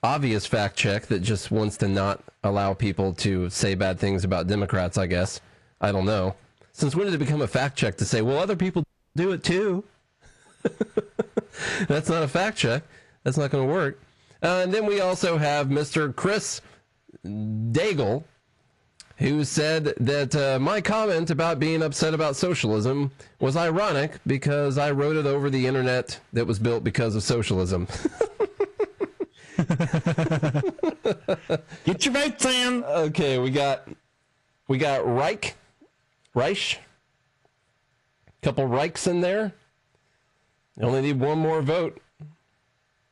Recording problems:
distortion; slight; 10 dB below the speech
garbled, watery; slightly
squashed, flat; somewhat
audio cutting out; at 9 s

